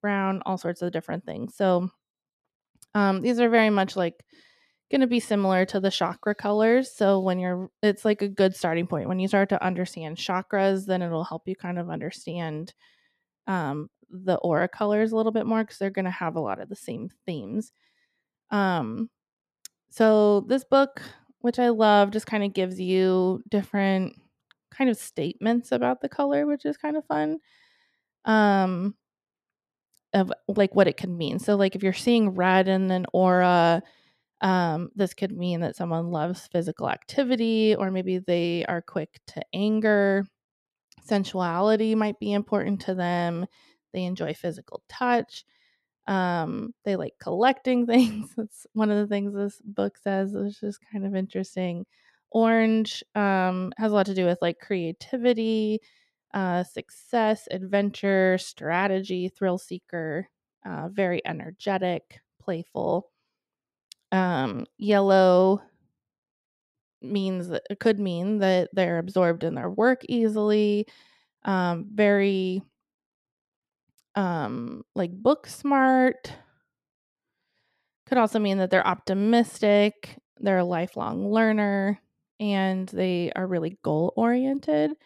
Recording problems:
none

